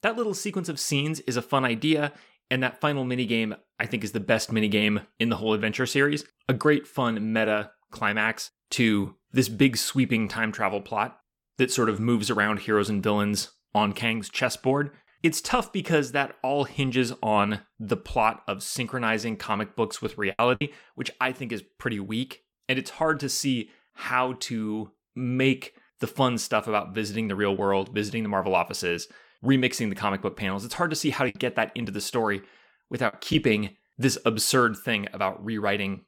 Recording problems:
choppy; very; at 20 s and from 31 to 33 s; 6% of the speech affected

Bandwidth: 17 kHz